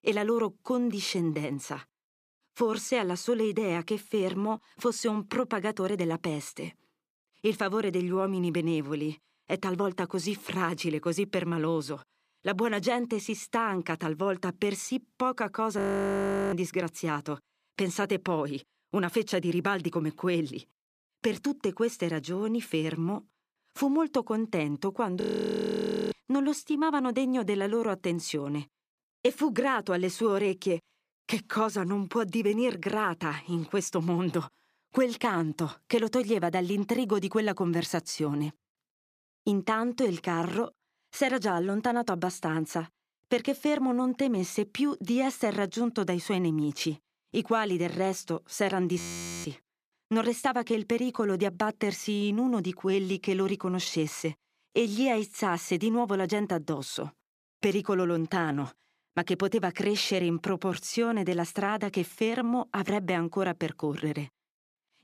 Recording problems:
audio freezing; at 16 s for 0.5 s, at 25 s for 1 s and at 49 s

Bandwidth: 15 kHz